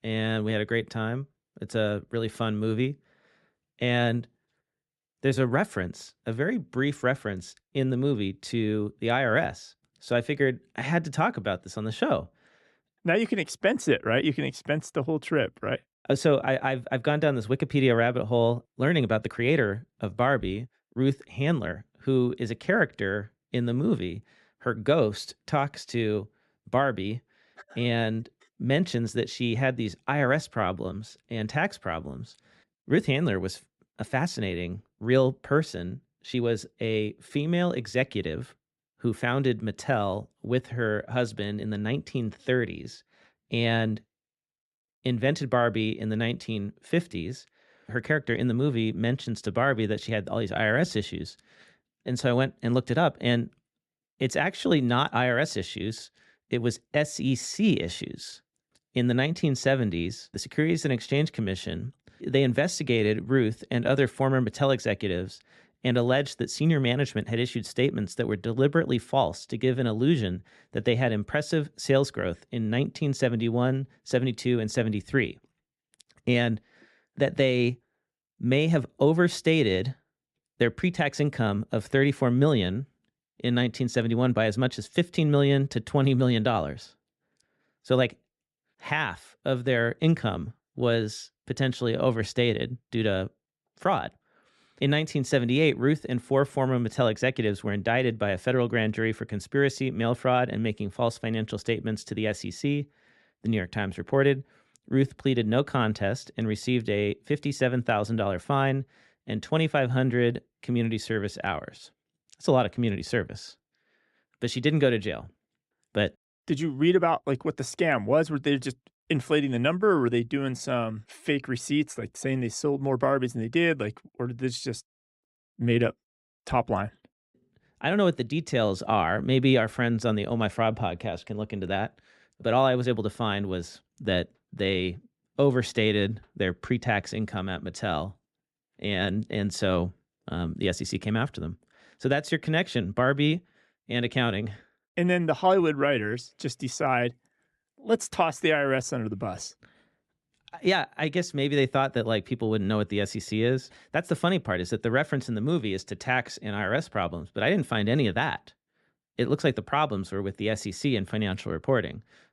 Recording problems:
uneven, jittery; slightly; from 5 s to 1:04

